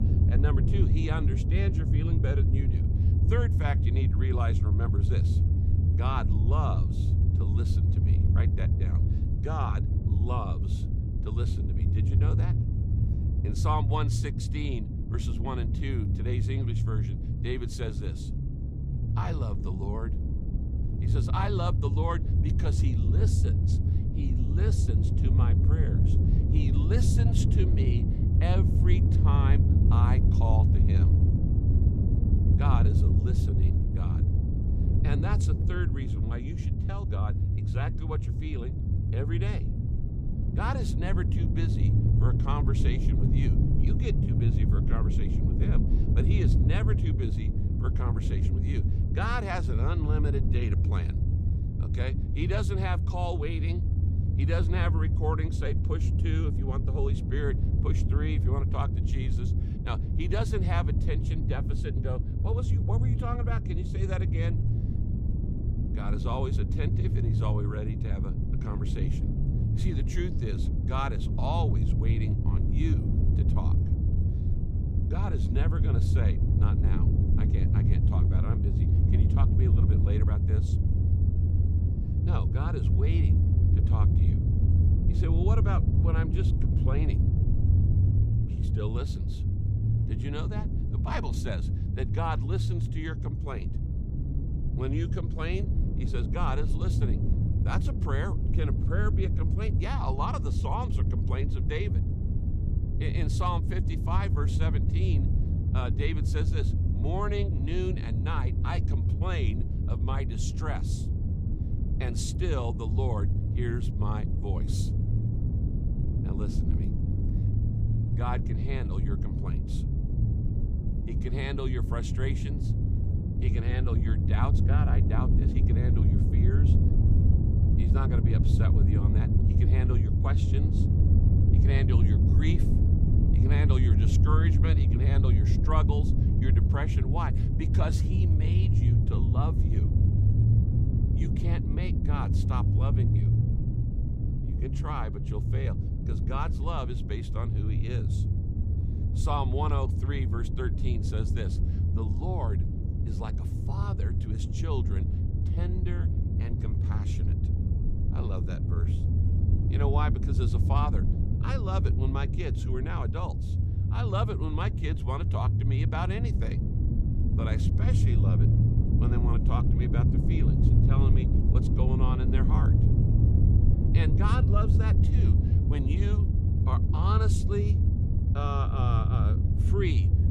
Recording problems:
low rumble; loud; throughout; 2 dB below the speech

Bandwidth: 15.5 kHz